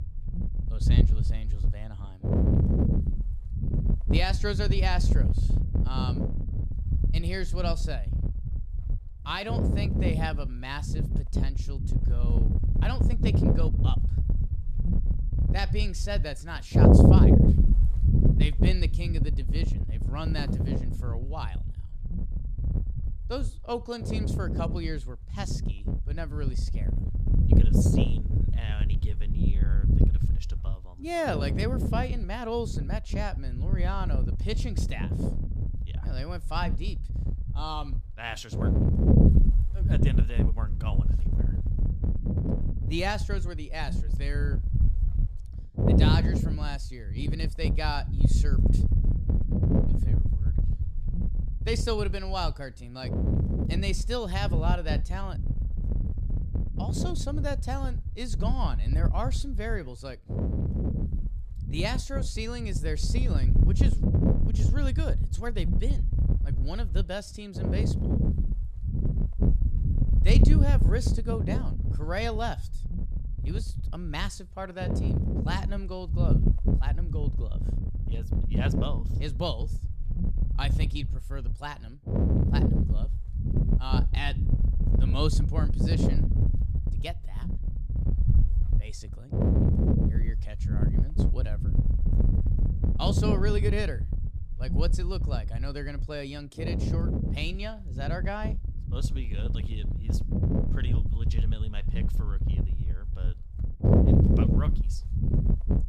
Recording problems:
wind noise on the microphone; heavy; 2 dB below the speech
footsteps; noticeable; at 20 s; peak 5 dB below the speech

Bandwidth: 15 kHz